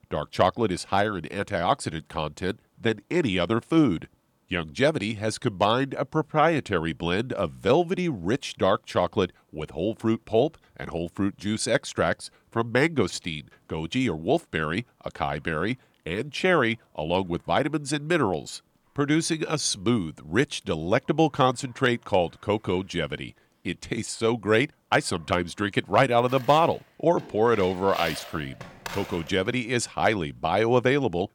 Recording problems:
household noises; noticeable; throughout; 15 dB below the speech

